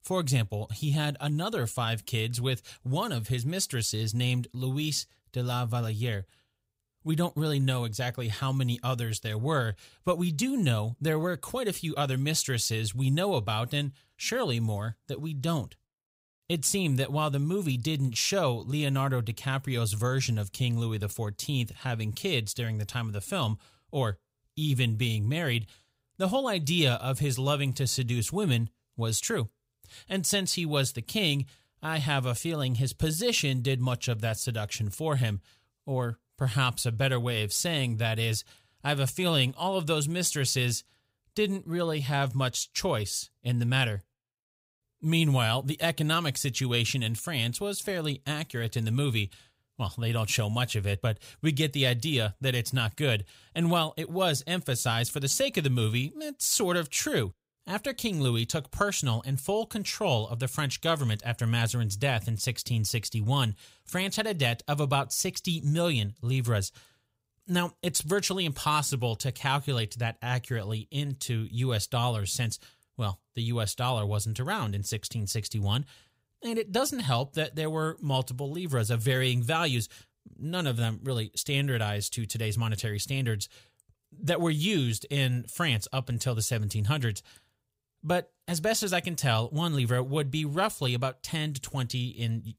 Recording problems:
none

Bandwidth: 15.5 kHz